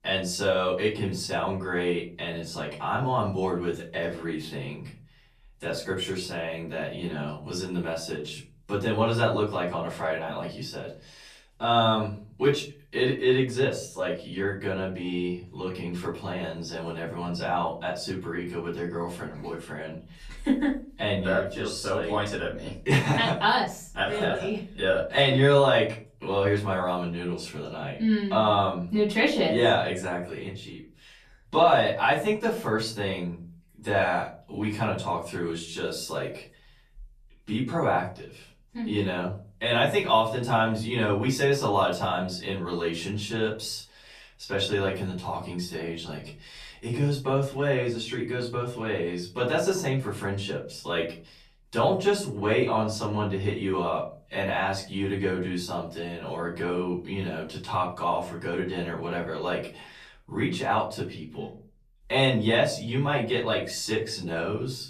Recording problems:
off-mic speech; far
room echo; slight; dies away in 0.3 s

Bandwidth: 14.5 kHz